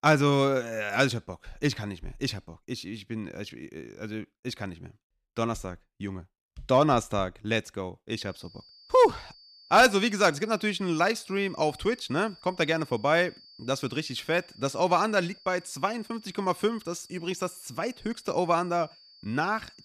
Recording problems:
high-pitched whine; faint; from 8.5 s on; 4.5 kHz, 25 dB below the speech

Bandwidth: 14.5 kHz